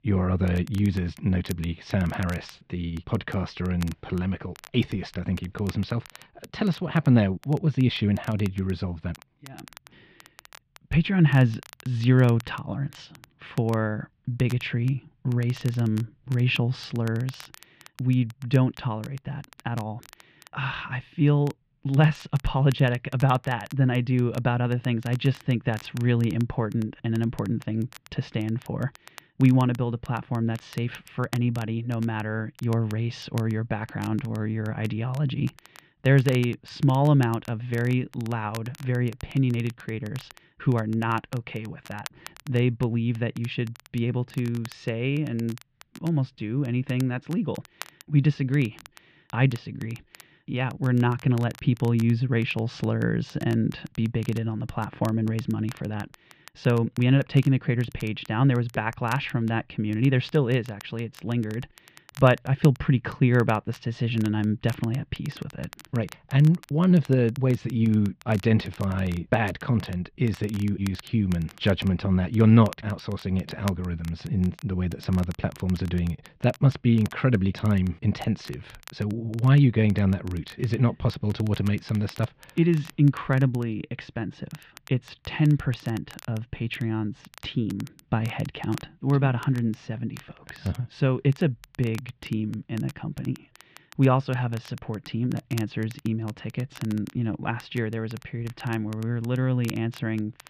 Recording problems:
muffled; very; fading above 3 kHz
crackle, like an old record; faint; 25 dB below the speech

